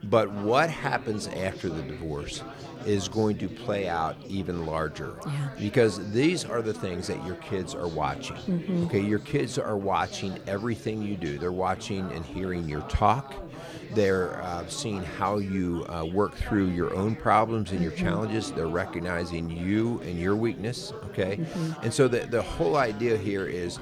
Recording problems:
chatter from many people; noticeable; throughout; 15 dB below the speech

